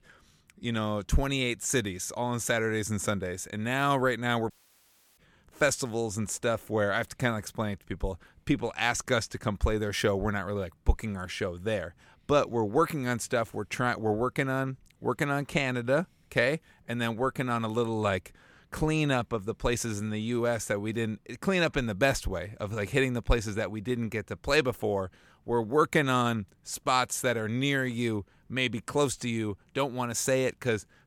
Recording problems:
audio cutting out; at 4.5 s for 0.5 s

